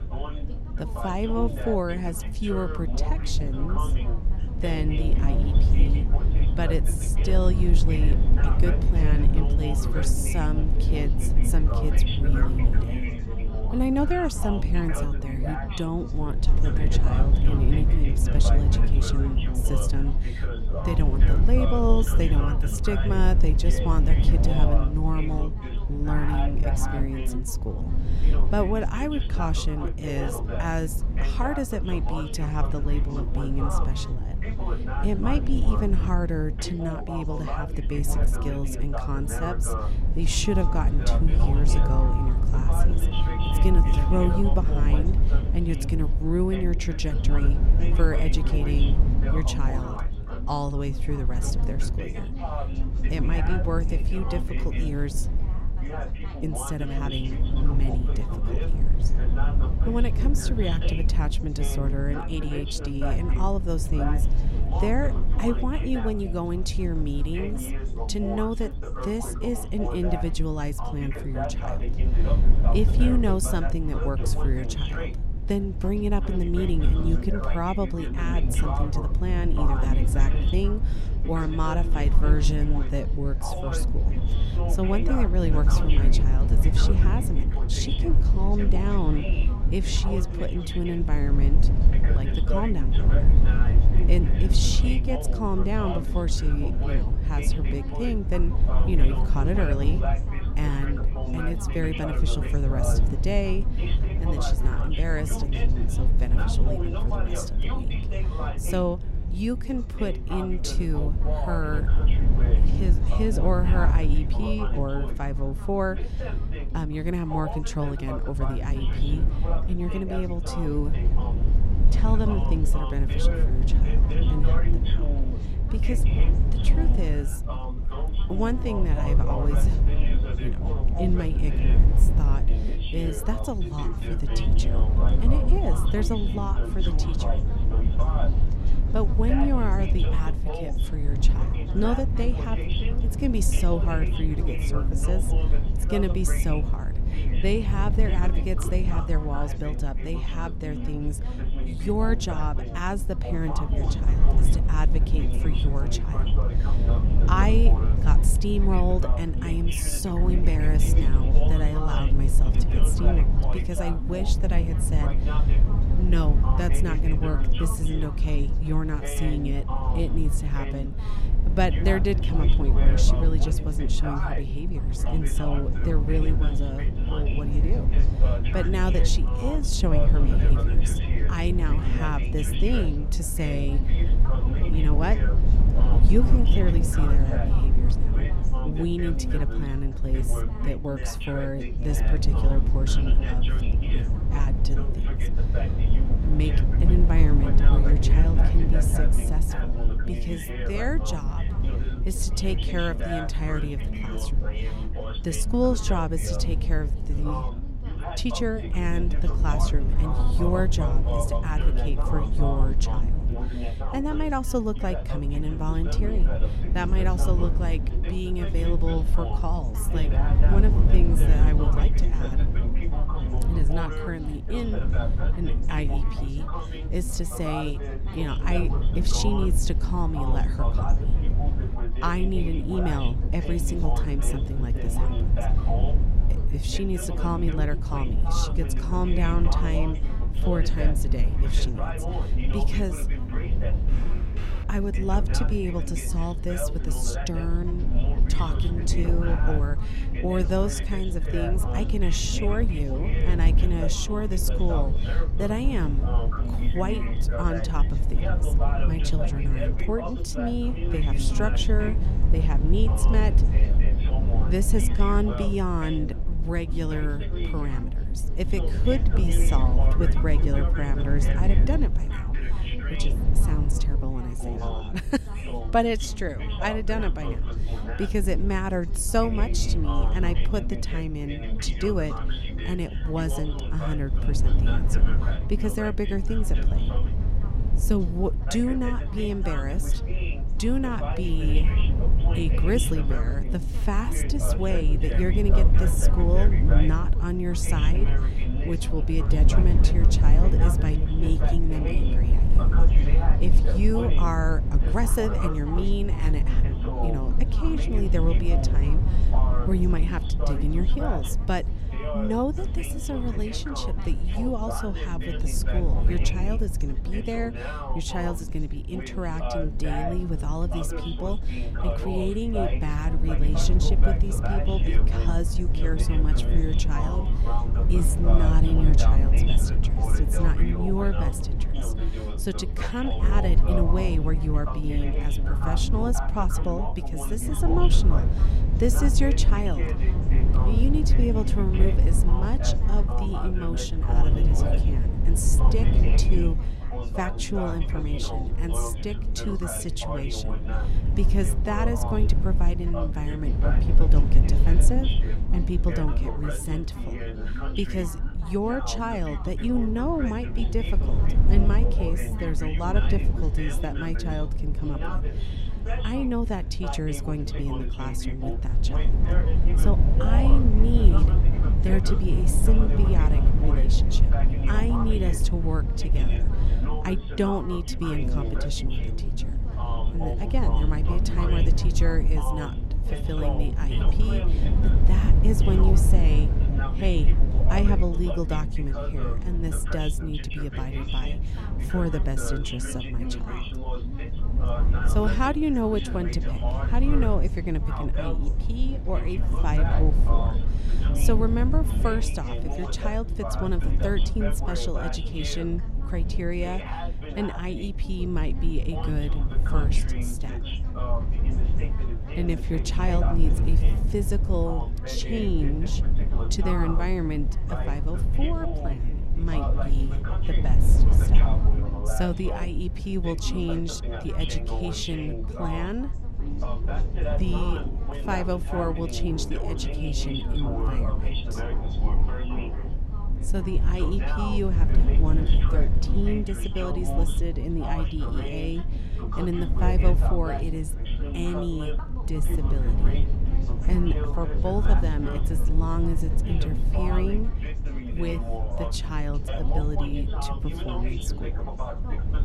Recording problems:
background chatter; loud; throughout; 3 voices, 7 dB below the speech
low rumble; loud; throughout; 8 dB below the speech
phone ringing; noticeable; from 40 to 44 s; peak 6 dB below the speech
footsteps; faint; at 4:04; peak 10 dB below the speech
footsteps; noticeable; from 7:06 to 7:13; peak 7 dB below the speech

